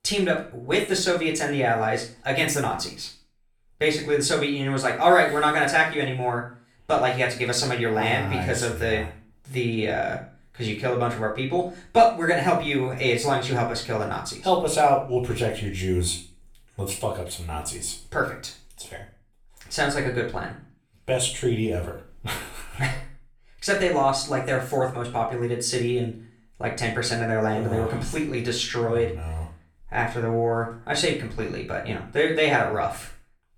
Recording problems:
off-mic speech; far
room echo; slight; dies away in 0.4 s

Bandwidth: 17.5 kHz